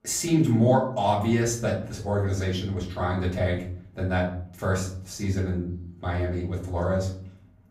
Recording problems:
off-mic speech; far
room echo; slight; dies away in 0.5 s

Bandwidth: 15.5 kHz